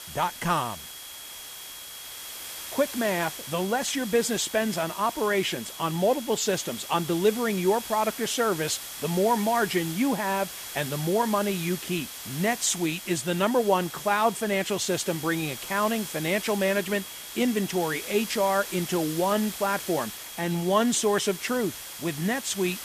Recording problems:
high-pitched whine; noticeable; throughout; 3.5 kHz, 20 dB below the speech
hiss; noticeable; throughout; 10 dB below the speech

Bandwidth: 14.5 kHz